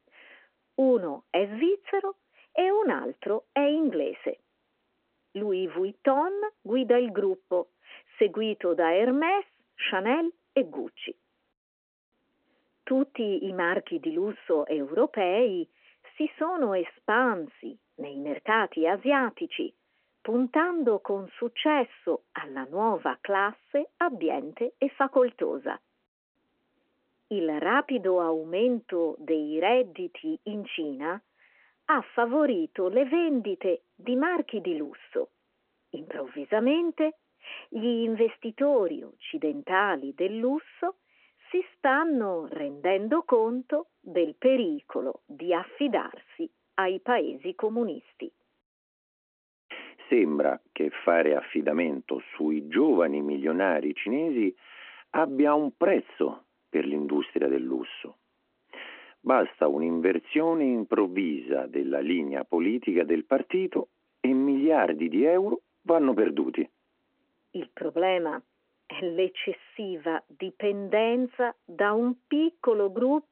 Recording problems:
phone-call audio

